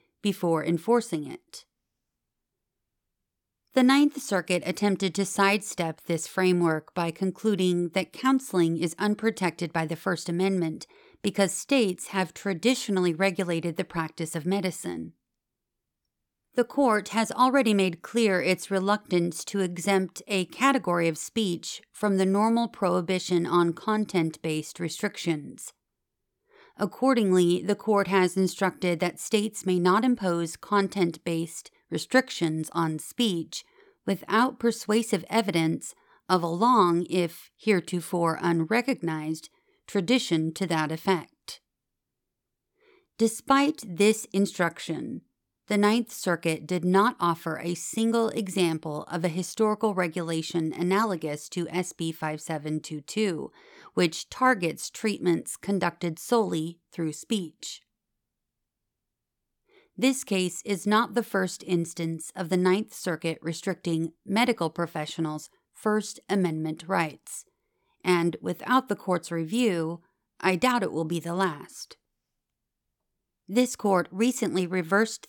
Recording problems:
none

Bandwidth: 18.5 kHz